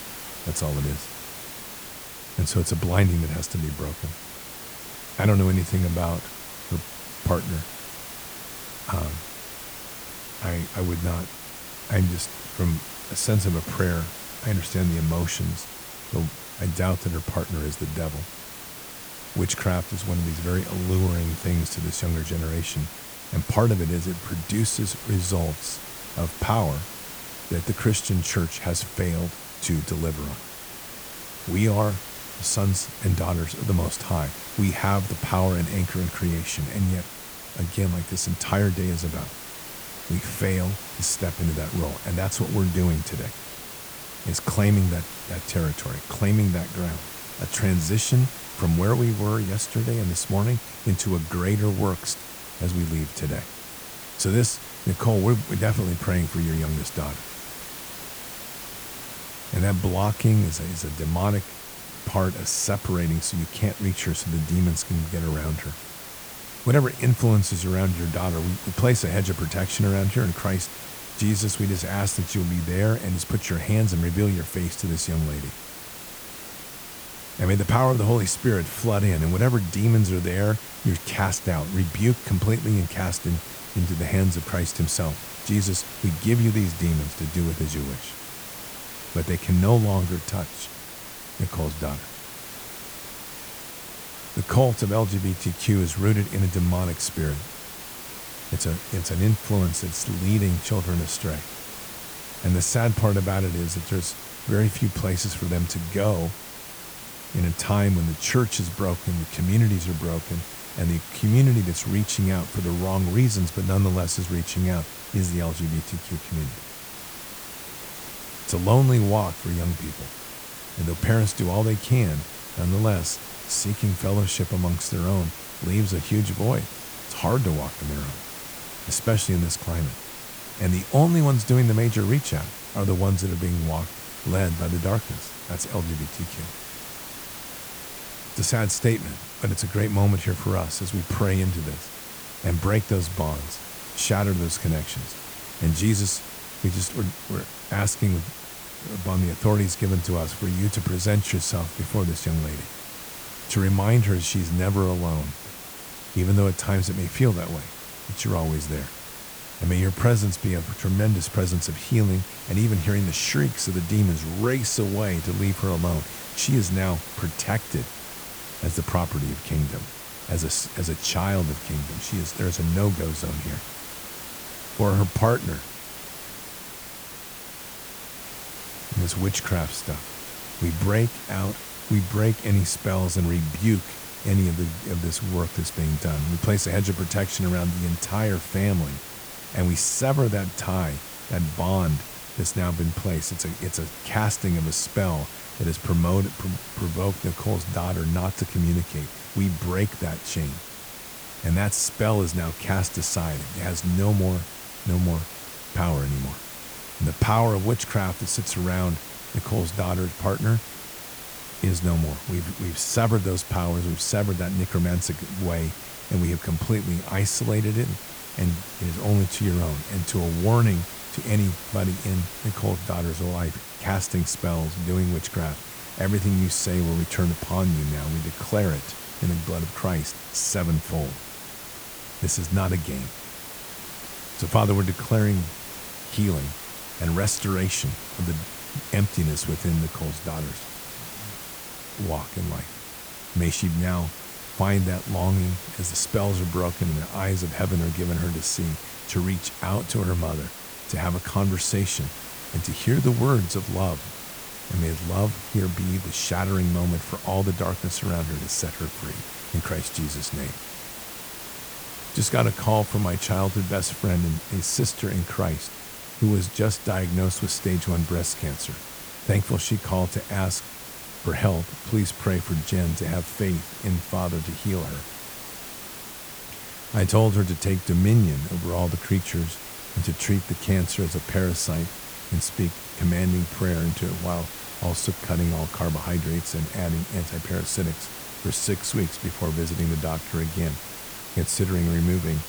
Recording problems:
hiss; loud; throughout; 10 dB below the speech

